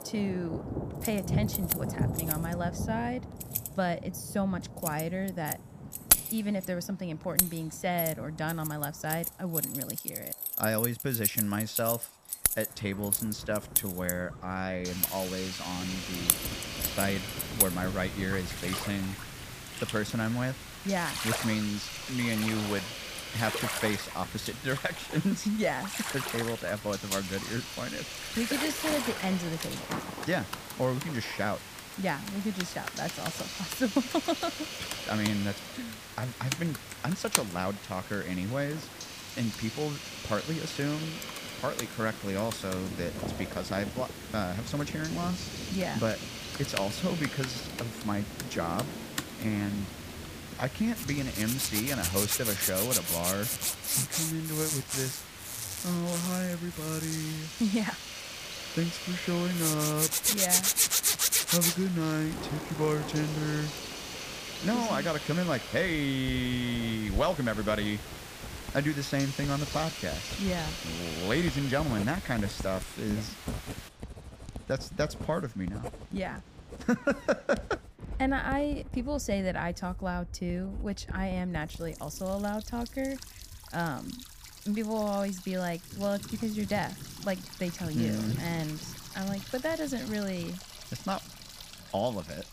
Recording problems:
household noises; very loud; throughout; as loud as the speech
hiss; loud; from 15 s to 1:14; 7 dB below the speech
rain or running water; noticeable; throughout; 10 dB below the speech

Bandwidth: 15 kHz